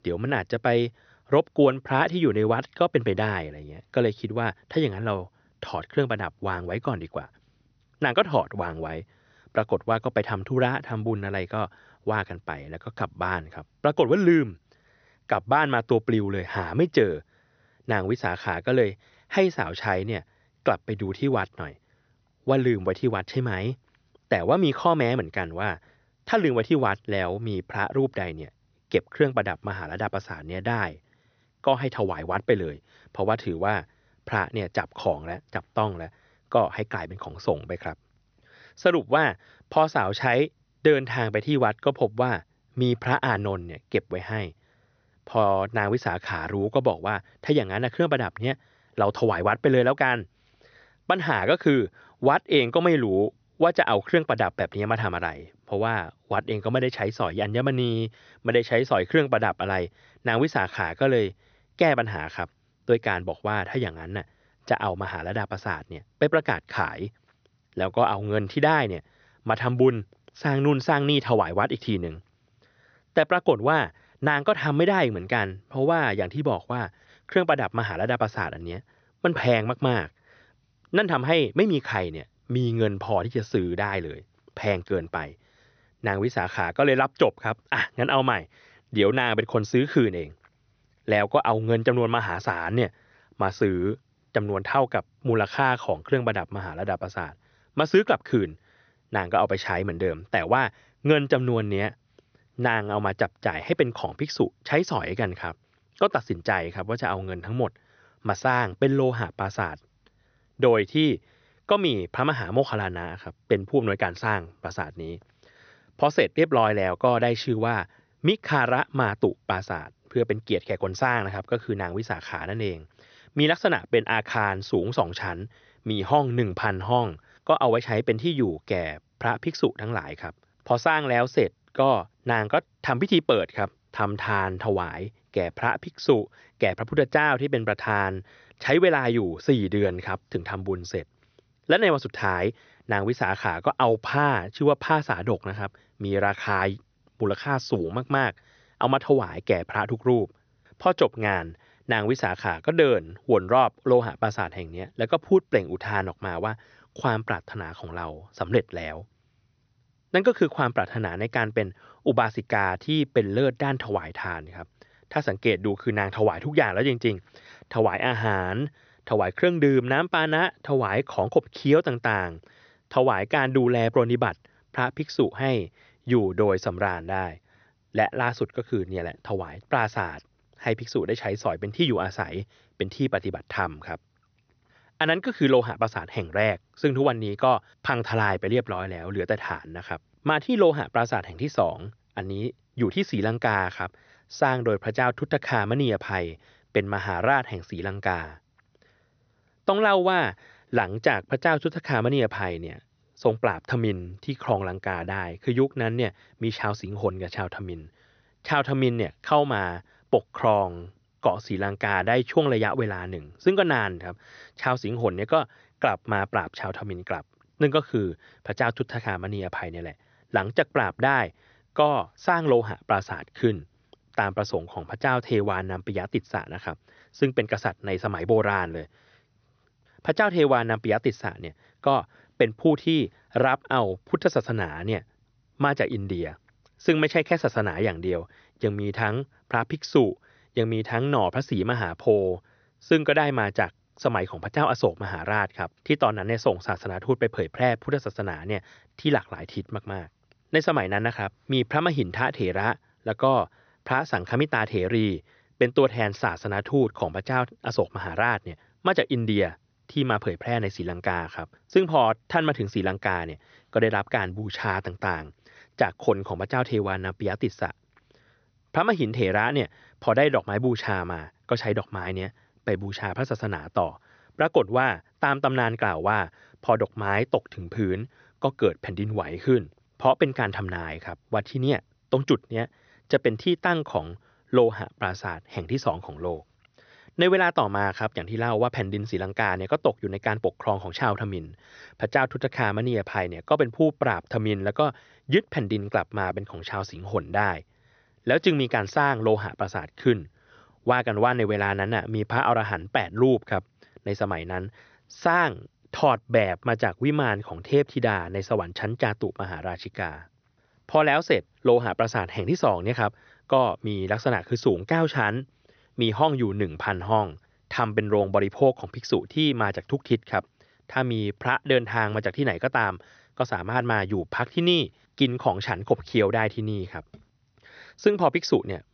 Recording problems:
high frequencies cut off; noticeable; nothing above 6 kHz

